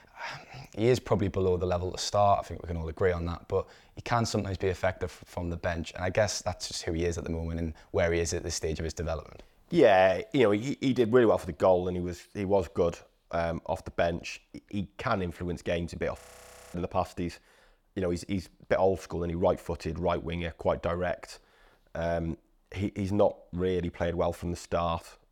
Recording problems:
audio freezing; at 16 s for 0.5 s

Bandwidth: 17.5 kHz